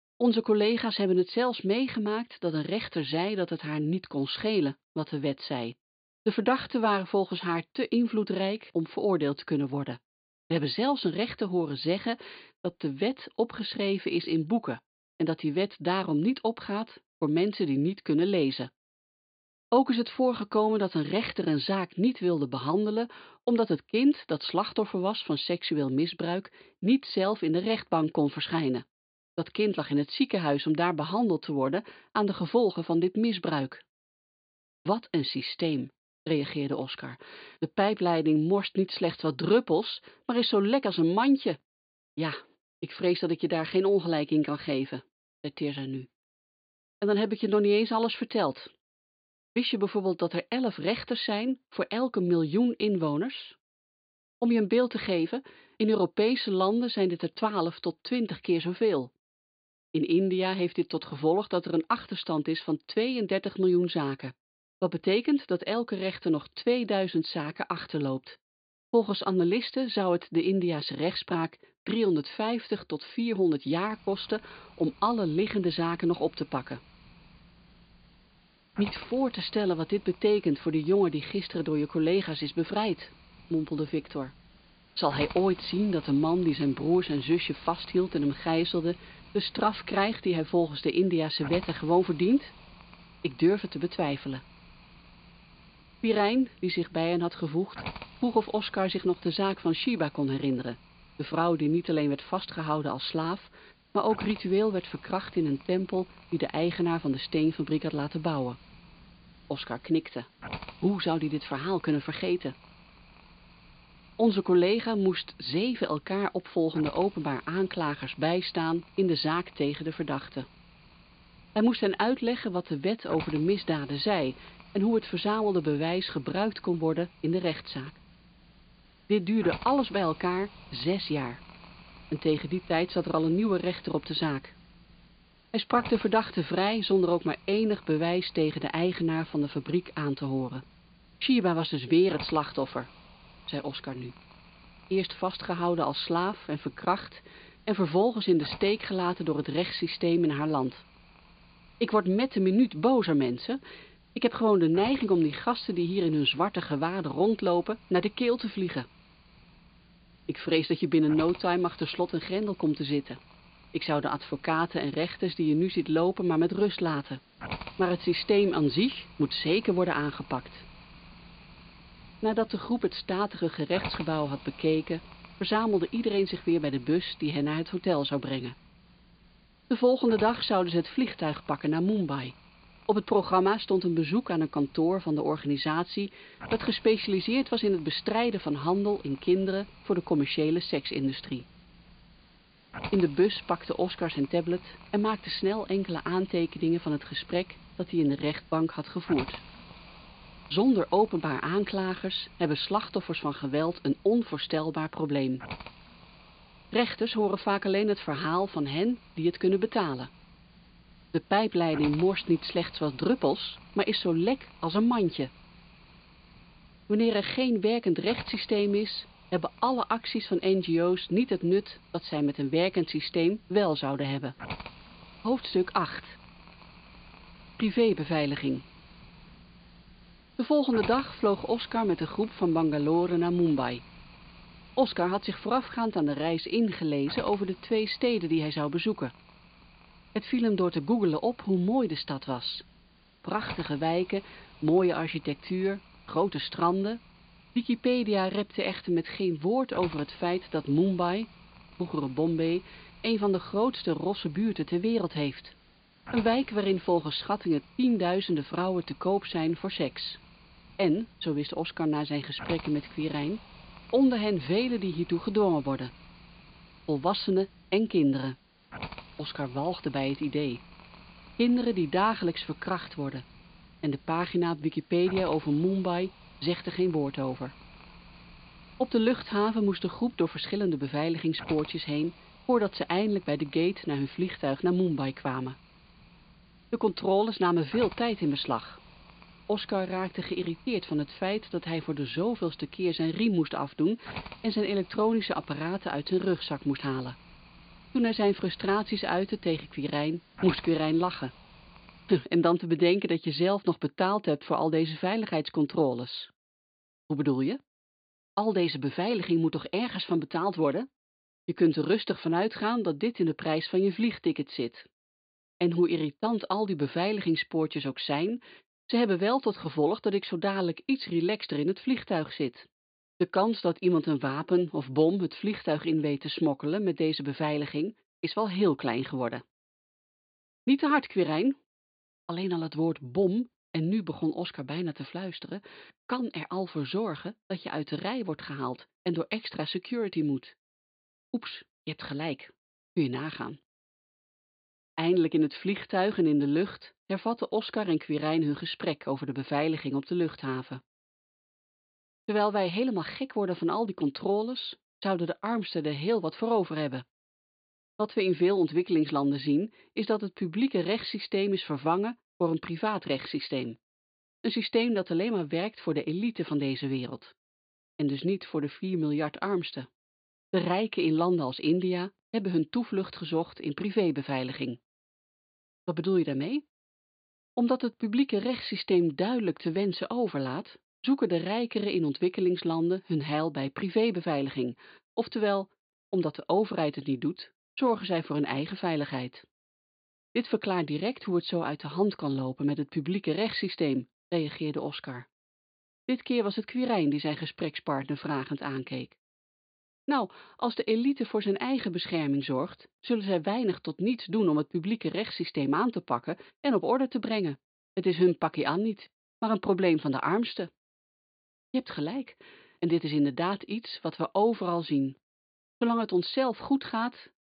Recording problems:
high frequencies cut off; severe; nothing above 4.5 kHz
hiss; faint; from 1:14 to 5:02; 20 dB below the speech

